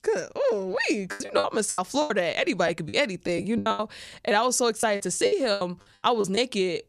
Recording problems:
choppy; very; 14% of the speech affected

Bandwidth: 14.5 kHz